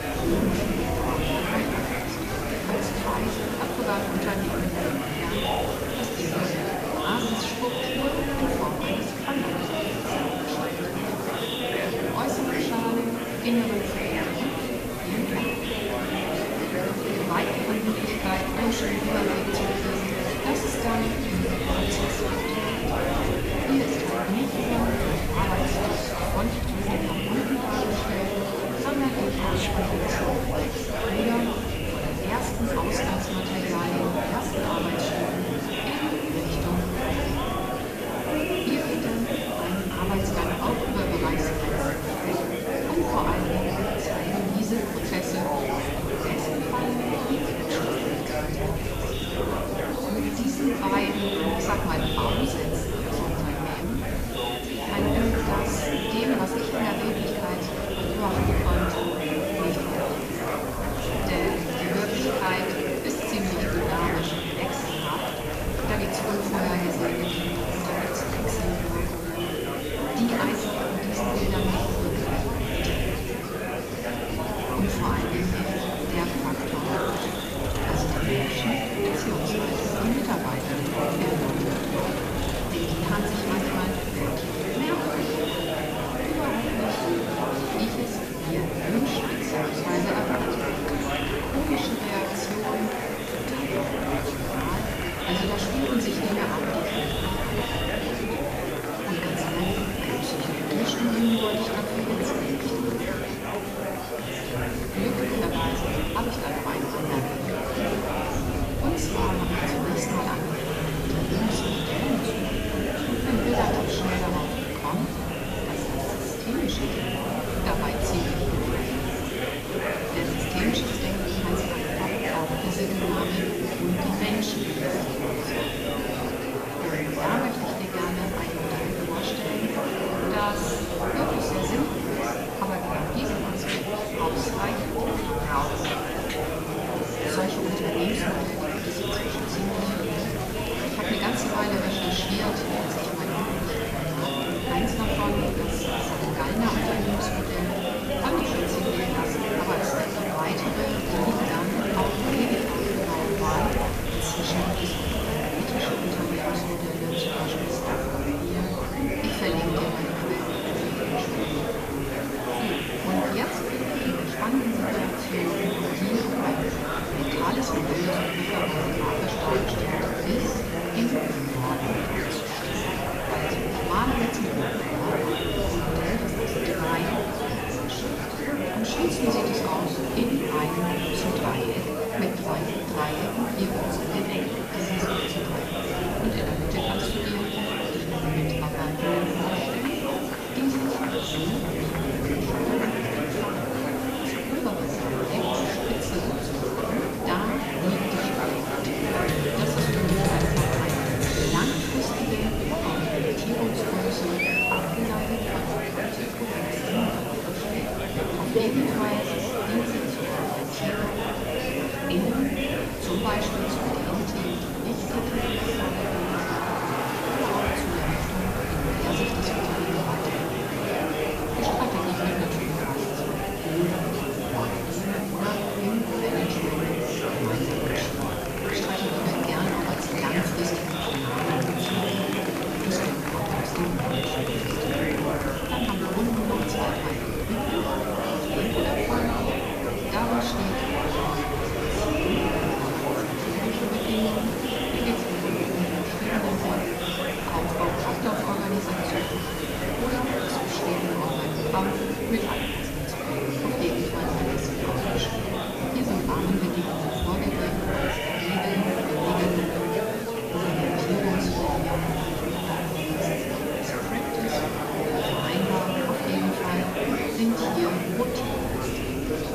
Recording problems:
off-mic speech; far
room echo; noticeable; dies away in 1.2 s
murmuring crowd; very loud; throughout; 3 dB above the speech
wind noise on the microphone; occasional gusts; 20 dB below the speech
hiss; noticeable; throughout; 10 dB below the speech
high-pitched whine; faint; throughout; 8.5 kHz, 30 dB below the speech

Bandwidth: 14.5 kHz